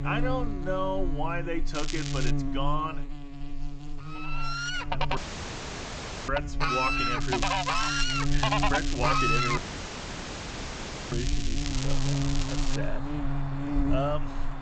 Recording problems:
high frequencies cut off; noticeable; nothing above 8 kHz
animal sounds; very loud; from 4.5 s on; 5 dB above the speech
electrical hum; loud; throughout; 50 Hz, 7 dB below the speech
crackling; loud; at 2 s and from 7 to 13 s; 3 dB below the speech
audio cutting out; at 5 s for 1 s and at 9.5 s for 1.5 s

